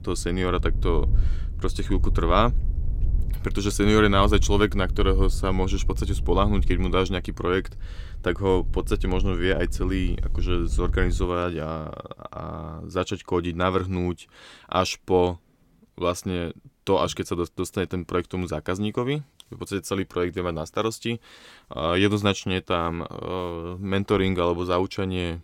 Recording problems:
wind noise on the microphone; occasional gusts; until 11 s; 20 dB below the speech

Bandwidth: 16.5 kHz